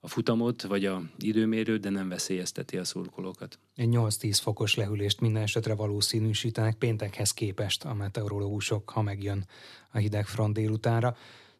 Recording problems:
none

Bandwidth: 13.5 kHz